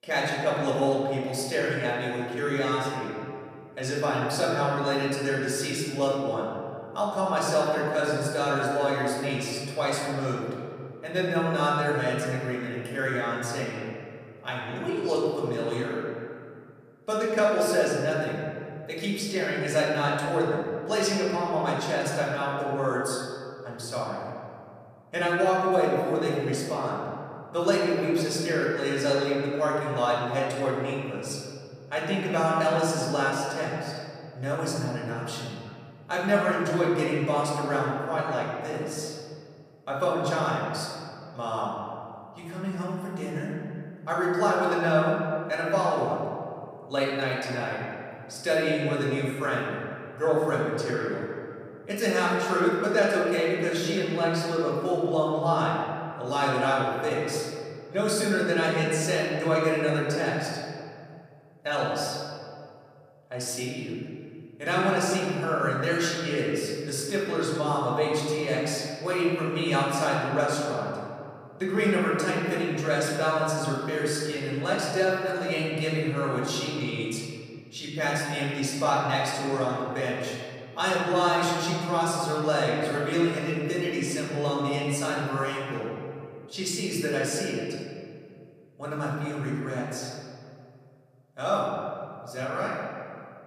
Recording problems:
off-mic speech; far
room echo; noticeable; dies away in 2.1 s

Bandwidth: 14.5 kHz